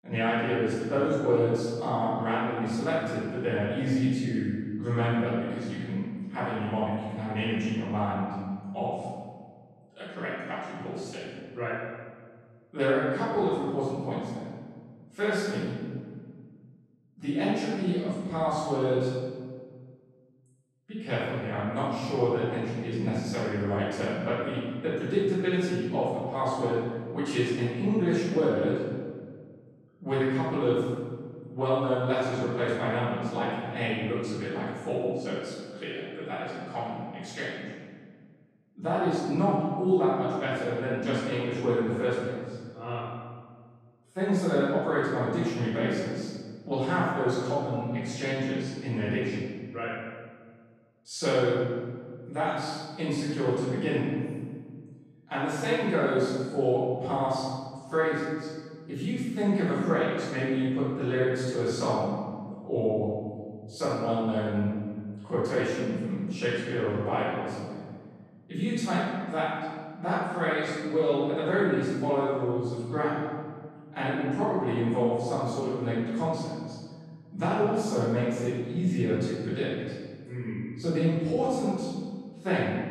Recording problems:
room echo; strong; dies away in 1.5 s
off-mic speech; far

